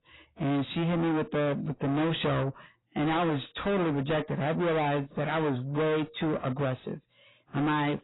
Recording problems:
distortion; heavy; 5 dB below the speech
garbled, watery; badly; nothing above 4 kHz

